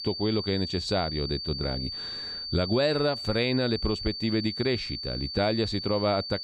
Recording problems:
high-pitched whine; loud; throughout; 4.5 kHz, 5 dB below the speech

